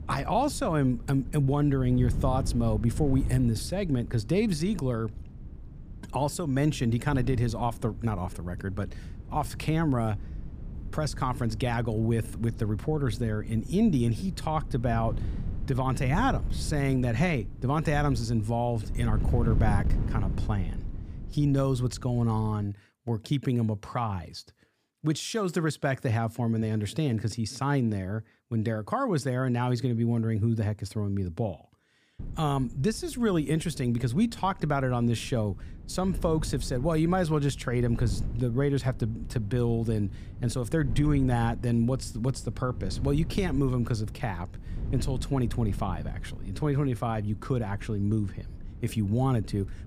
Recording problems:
wind noise on the microphone; occasional gusts; until 23 s and from 32 s on; 15 dB below the speech

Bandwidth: 15 kHz